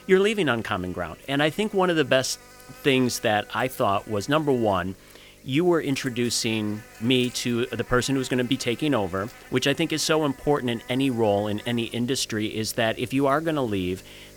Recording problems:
electrical hum; faint; throughout; 50 Hz, 20 dB below the speech

